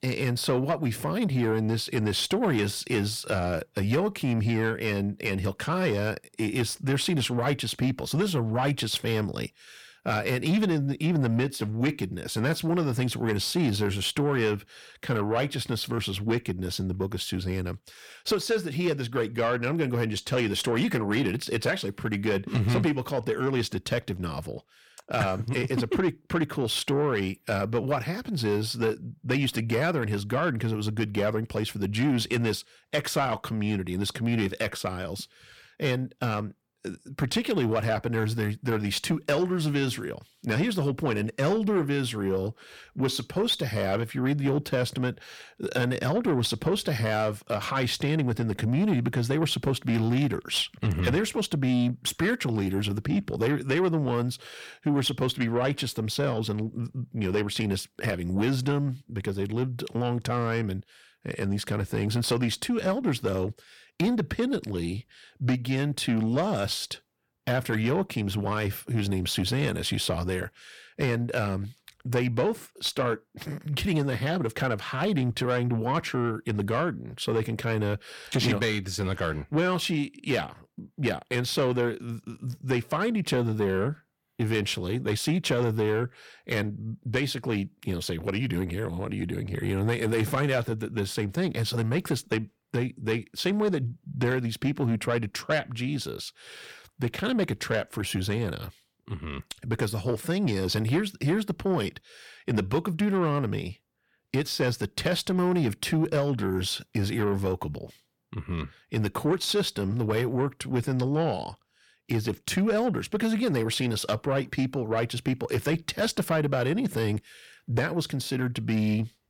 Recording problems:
distortion; slight; 10 dB below the speech

